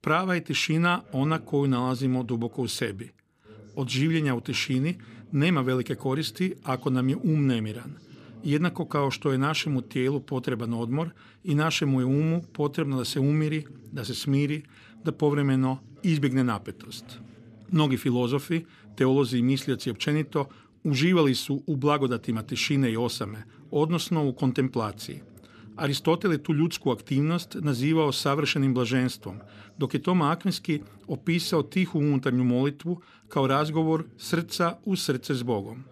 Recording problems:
voice in the background; faint; throughout; 25 dB below the speech

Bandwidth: 14 kHz